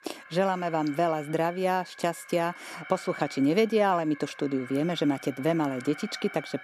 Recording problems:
alarms or sirens; noticeable; throughout; 15 dB below the speech

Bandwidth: 14.5 kHz